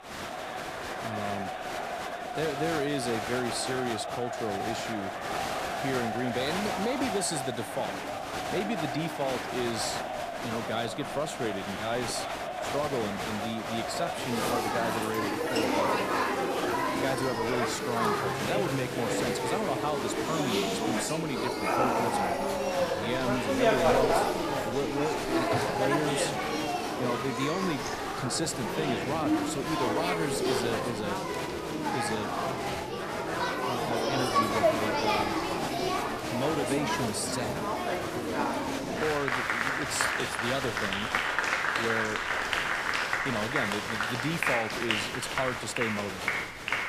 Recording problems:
crowd noise; very loud; throughout; 3 dB above the speech
wind in the background; noticeable; throughout; 20 dB below the speech

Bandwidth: 14.5 kHz